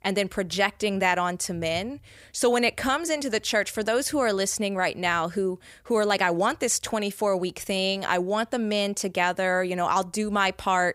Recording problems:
none

